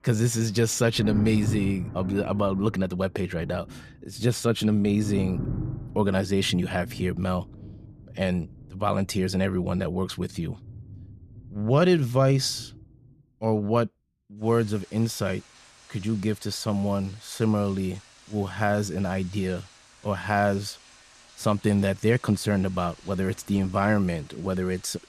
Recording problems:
rain or running water; noticeable; throughout; 15 dB below the speech

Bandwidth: 14.5 kHz